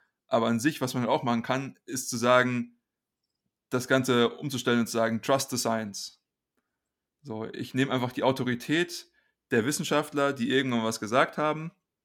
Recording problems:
none

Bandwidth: 17.5 kHz